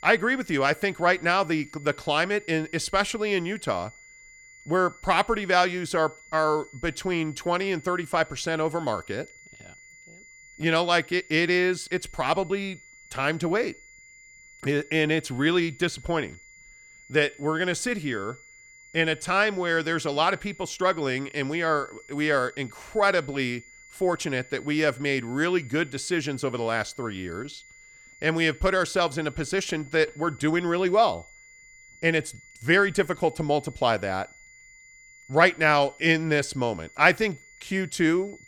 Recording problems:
high-pitched whine; faint; throughout; 2 kHz, 25 dB below the speech

